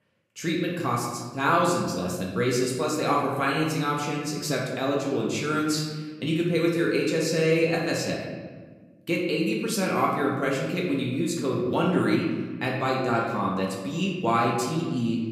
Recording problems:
off-mic speech; far
room echo; noticeable; dies away in 1.3 s

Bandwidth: 15.5 kHz